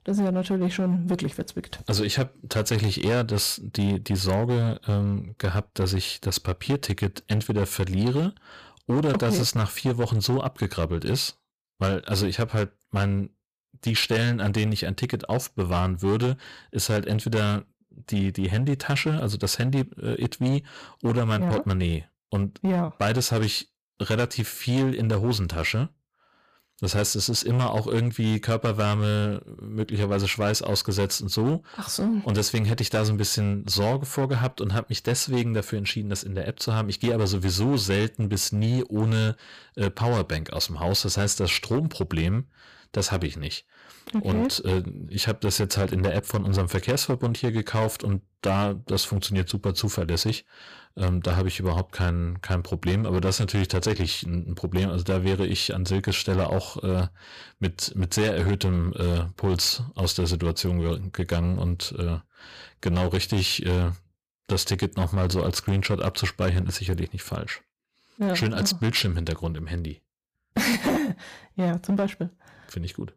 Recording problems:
distortion; slight; 10% of the sound clipped

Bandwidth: 15 kHz